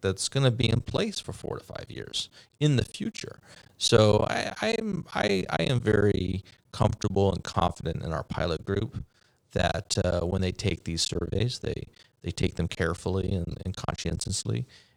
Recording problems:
choppy; very; 13% of the speech affected

